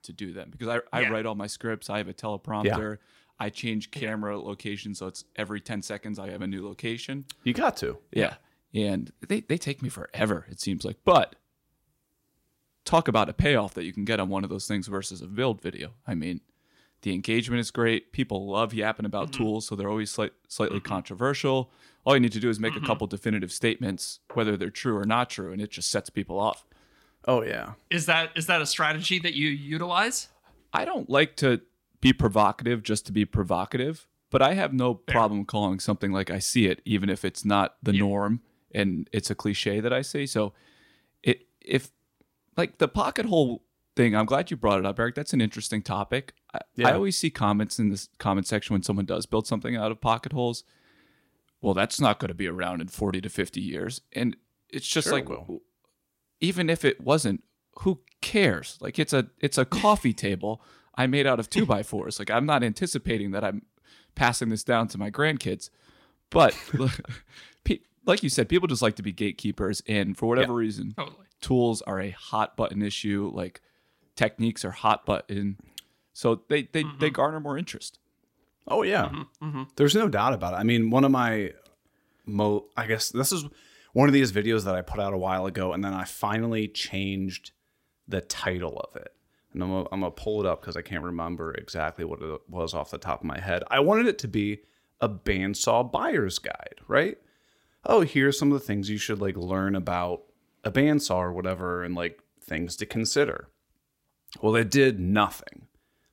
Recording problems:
none

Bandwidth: 16 kHz